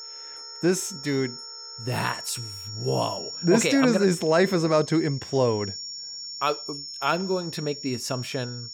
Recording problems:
high-pitched whine; loud; throughout; 5.5 kHz, 10 dB below the speech
background music; faint; throughout; 30 dB below the speech

